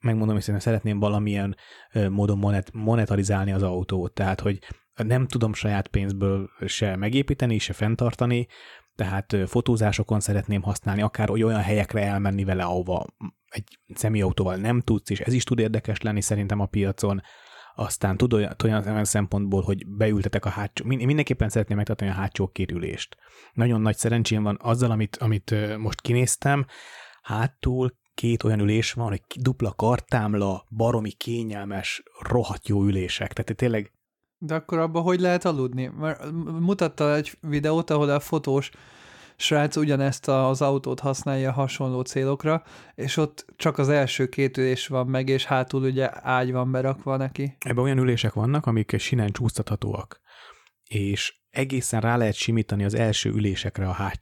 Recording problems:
none

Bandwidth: 17 kHz